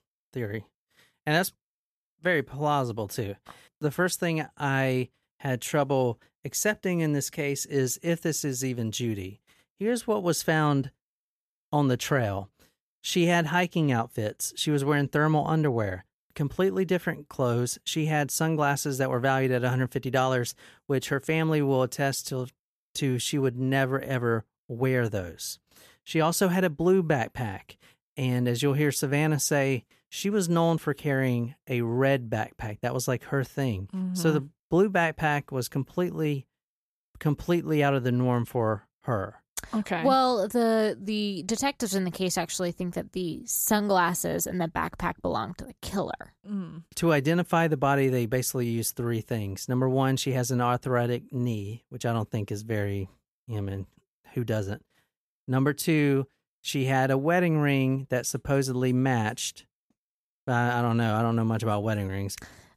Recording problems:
none

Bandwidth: 14.5 kHz